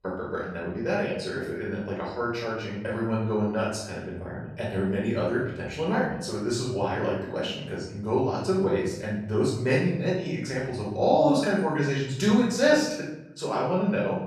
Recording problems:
off-mic speech; far
room echo; noticeable; dies away in 0.8 s

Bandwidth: 15.5 kHz